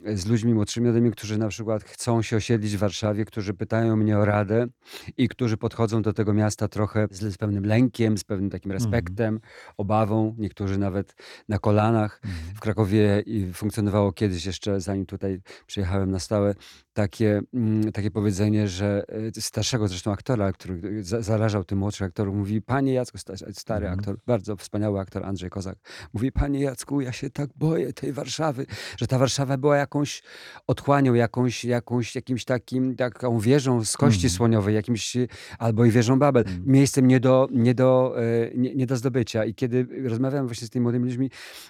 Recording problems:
none

